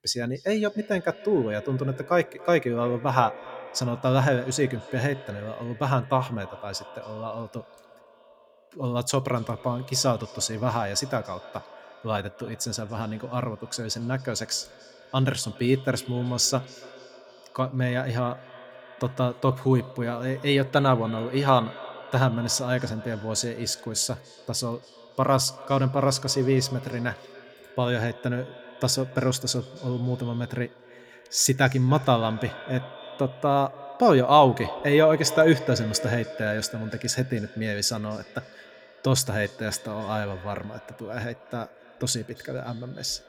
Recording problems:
echo of what is said; noticeable; throughout; 280 ms later, 15 dB below the speech

